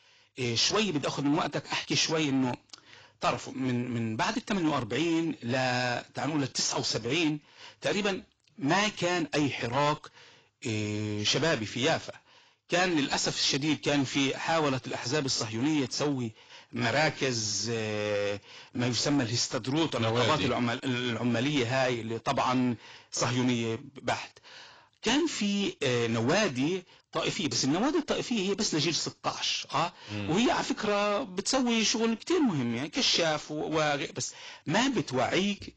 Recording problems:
distortion; heavy; 8 dB below the speech
garbled, watery; badly; nothing above 7.5 kHz

